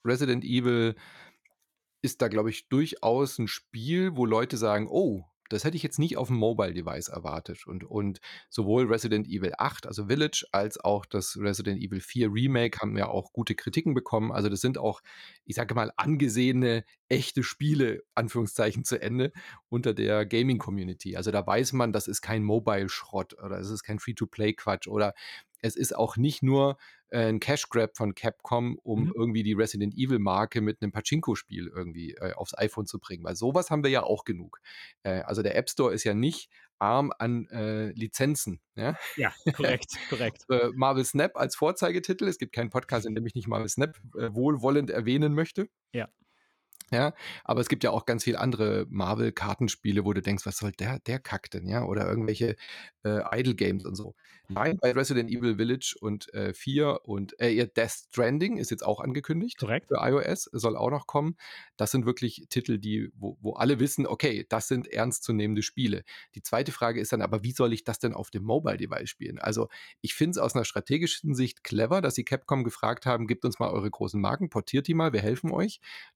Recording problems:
choppy; very; from 43 to 44 s and from 52 to 55 s; 16% of the speech affected

